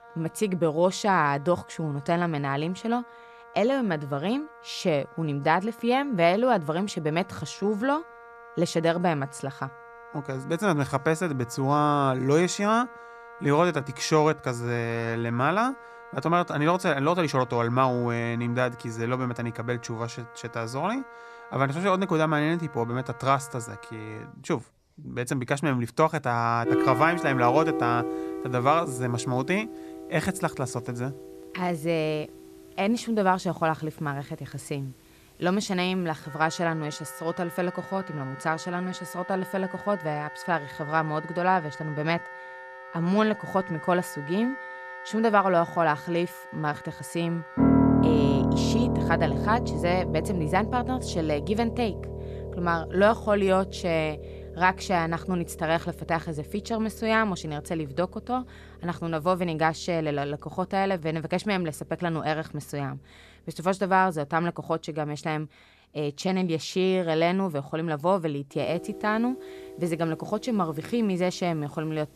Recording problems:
background music; loud; throughout; 7 dB below the speech

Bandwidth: 14 kHz